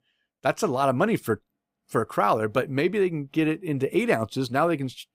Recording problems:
none

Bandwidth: 15.5 kHz